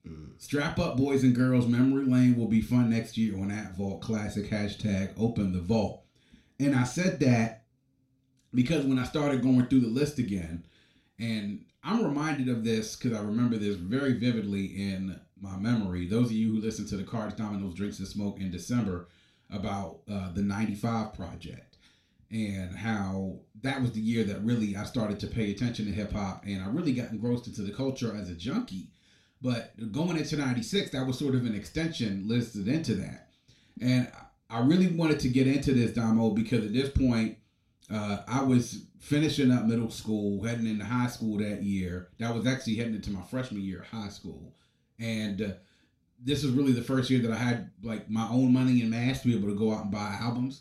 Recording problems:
room echo; slight; dies away in 0.3 s
off-mic speech; somewhat distant

